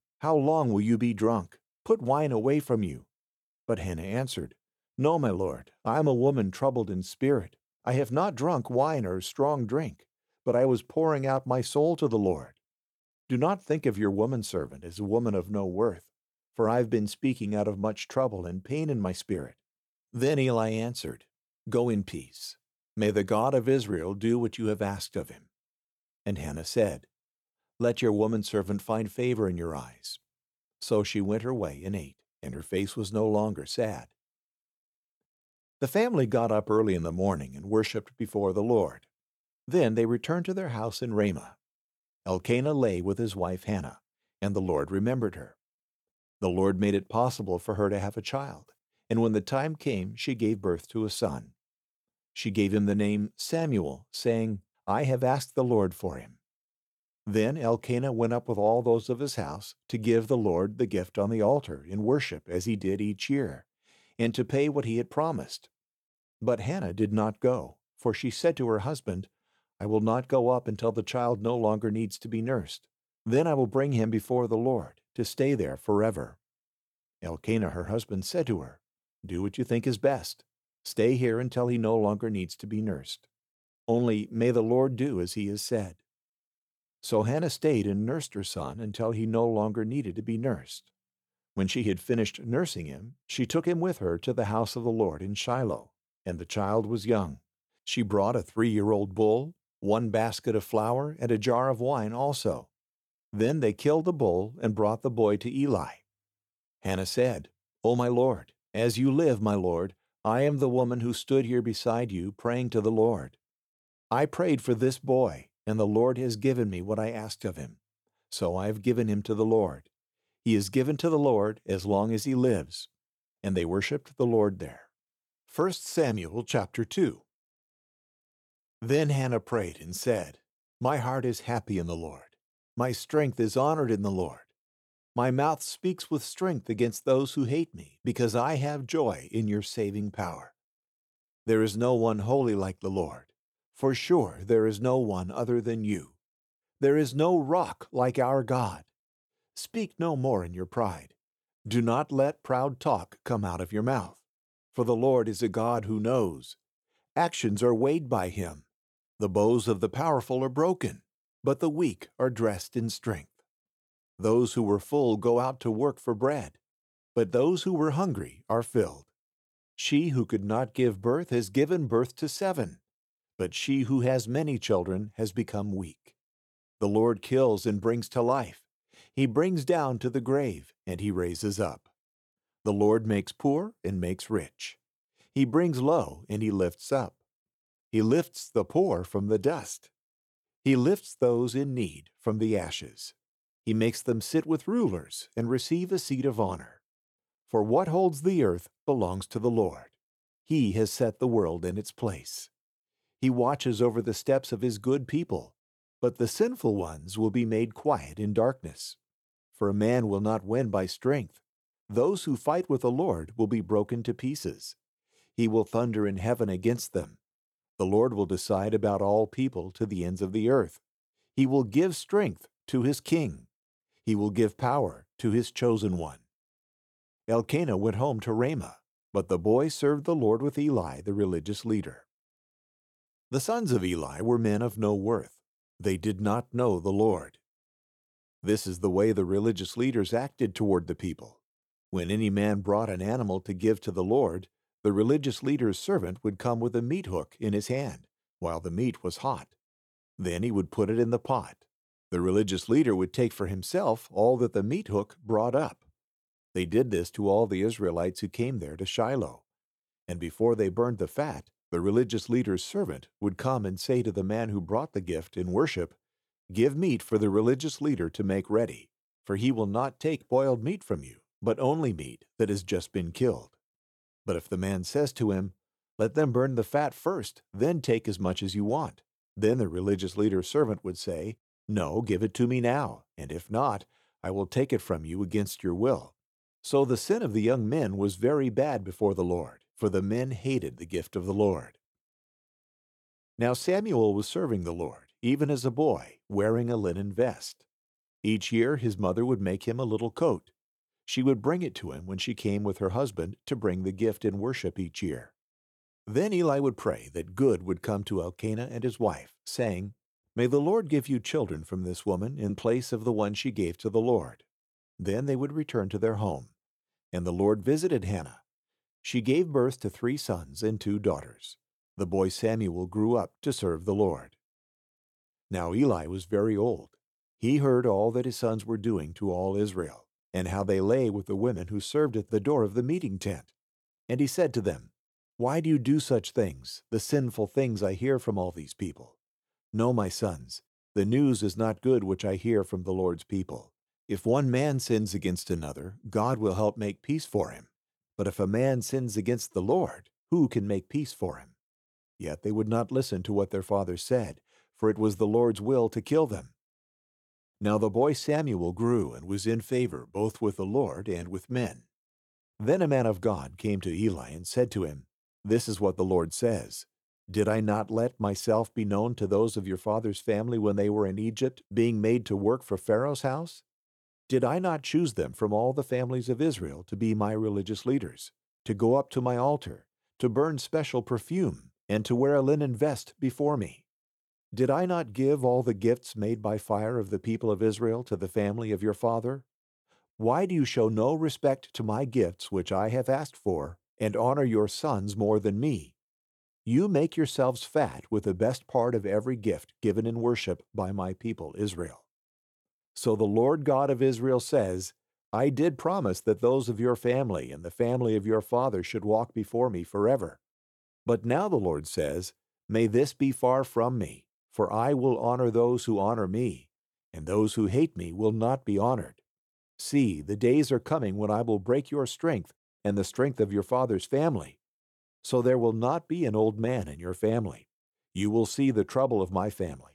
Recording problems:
none

